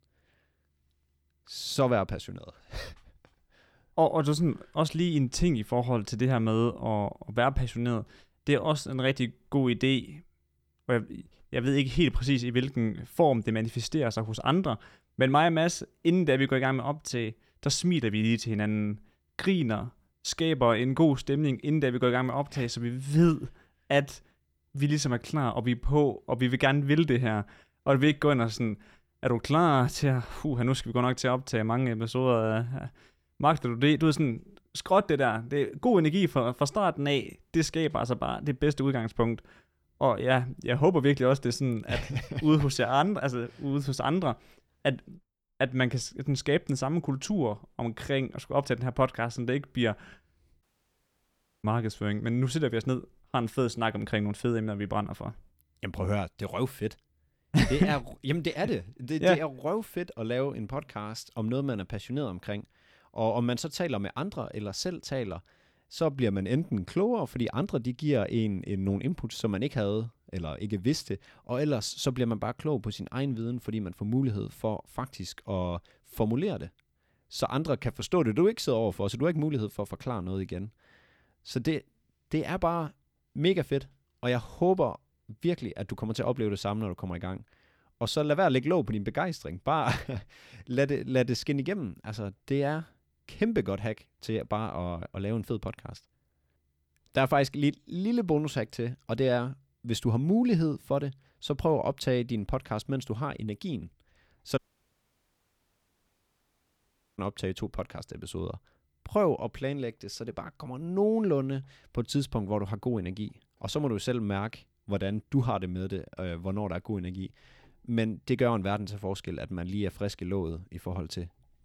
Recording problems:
audio cutting out; at 51 s for 1 s and at 1:45 for 2.5 s

